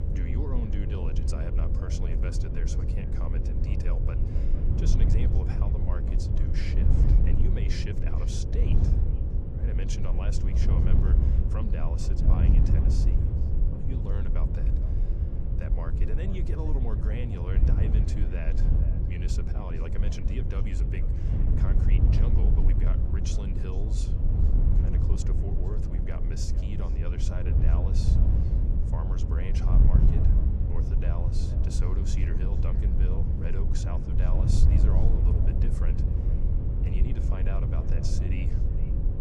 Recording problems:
echo of what is said; noticeable; throughout; 460 ms later, 15 dB below the speech
wind noise on the microphone; heavy; 1 dB above the speech
electrical hum; loud; throughout; 50 Hz, 8 dB below the speech

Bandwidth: 14.5 kHz